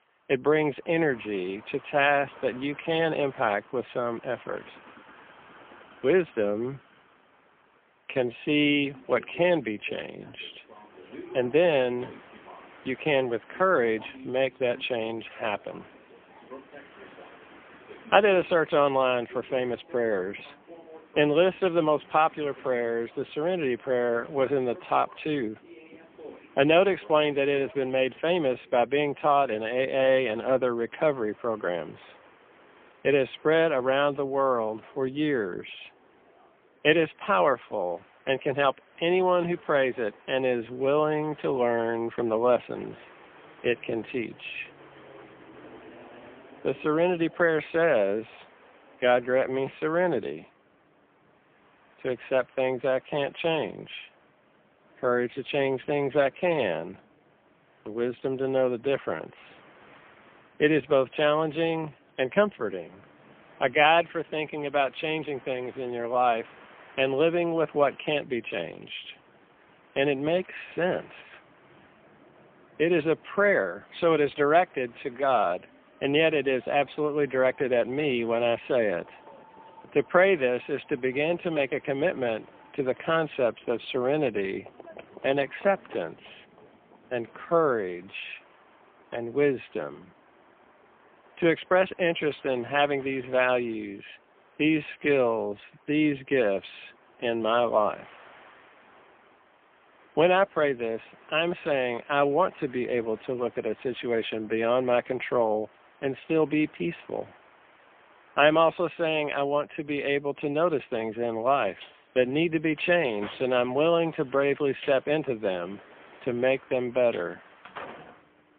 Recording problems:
phone-call audio; poor line; nothing above 3.5 kHz
train or aircraft noise; faint; throughout; 25 dB below the speech

